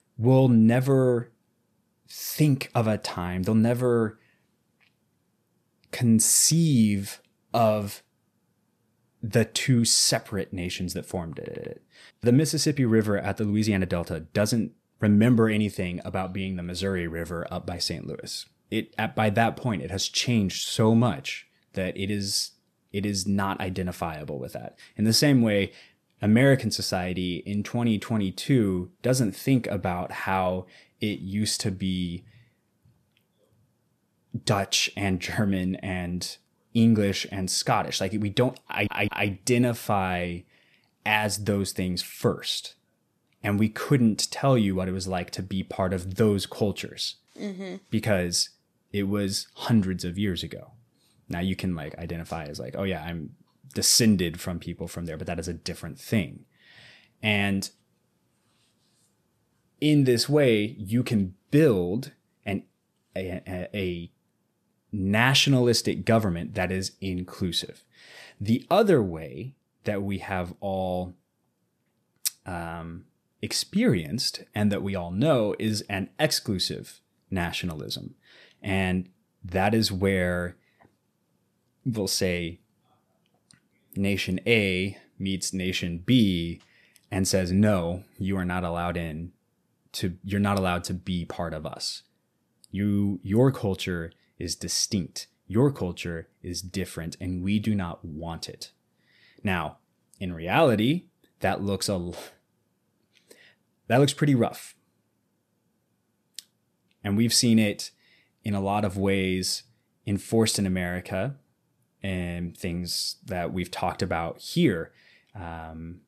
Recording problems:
audio stuttering; at 11 s and at 39 s

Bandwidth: 14 kHz